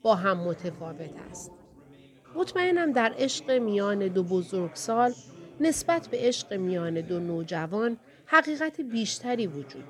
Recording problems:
background chatter; faint; throughout; 4 voices, 20 dB below the speech

